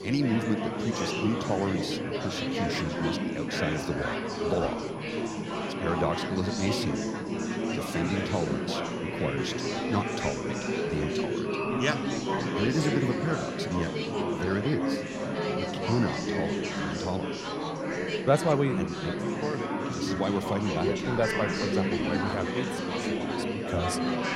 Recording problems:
chatter from many people; very loud; throughout; 1 dB above the speech
high-pitched whine; faint; throughout; 10.5 kHz, 30 dB below the speech

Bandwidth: 16 kHz